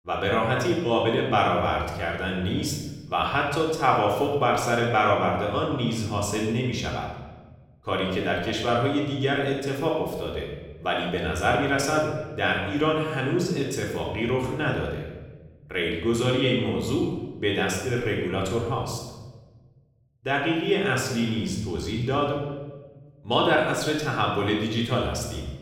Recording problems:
off-mic speech; far
room echo; noticeable; dies away in 1 s

